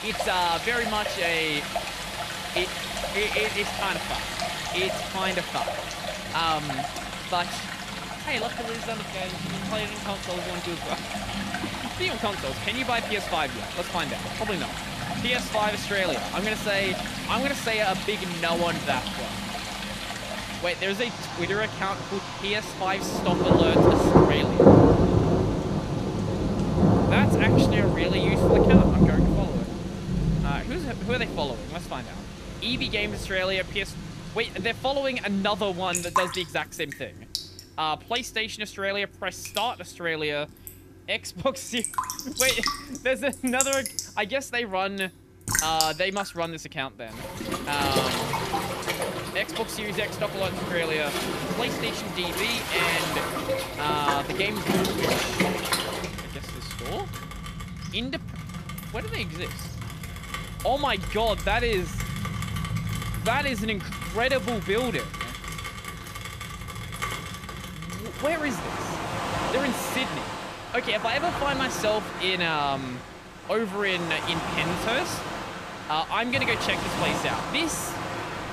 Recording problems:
rain or running water; very loud; throughout; 1 dB above the speech

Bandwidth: 14.5 kHz